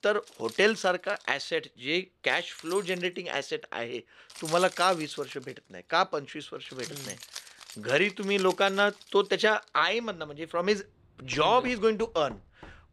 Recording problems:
household noises; noticeable; throughout; 15 dB below the speech

